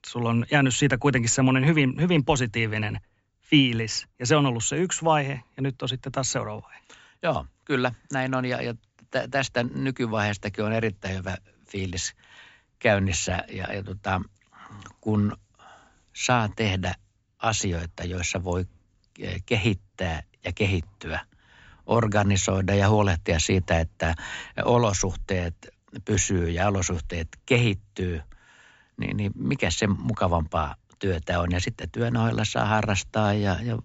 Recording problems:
high frequencies cut off; noticeable; nothing above 8 kHz

